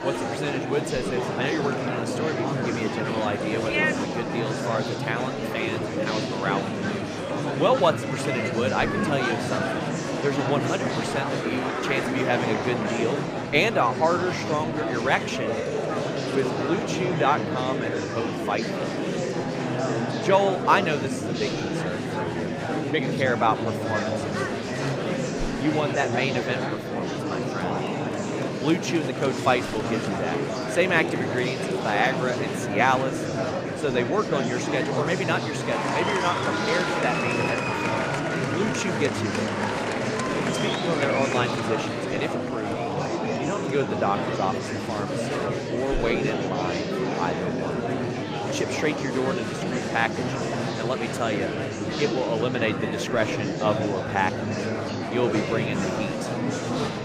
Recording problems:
murmuring crowd; very loud; throughout; as loud as the speech

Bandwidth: 15 kHz